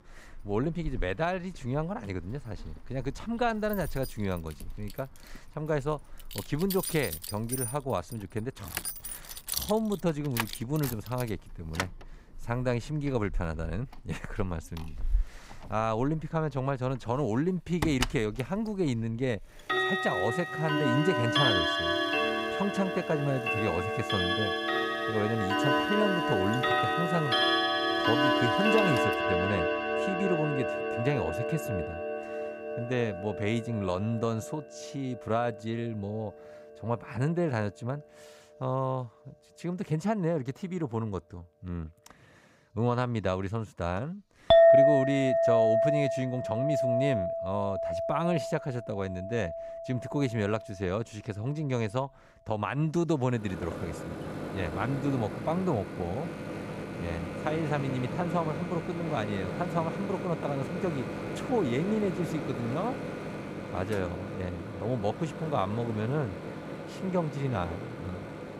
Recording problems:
household noises; very loud; throughout; 2 dB above the speech

